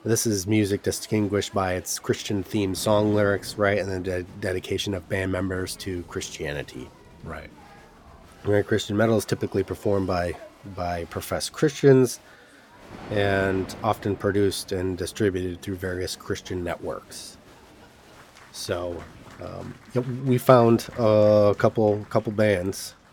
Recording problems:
crowd noise; faint; throughout; 25 dB below the speech
rain or running water; faint; throughout; 25 dB below the speech

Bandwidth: 17.5 kHz